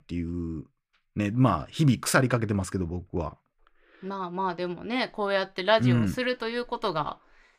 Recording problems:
none

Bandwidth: 15 kHz